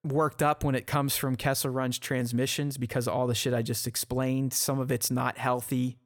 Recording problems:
none

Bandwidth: 18 kHz